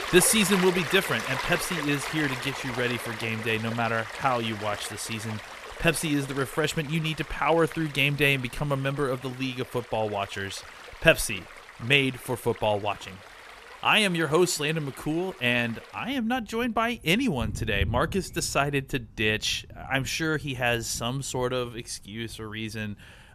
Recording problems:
rain or running water; noticeable; throughout; 10 dB below the speech

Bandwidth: 14 kHz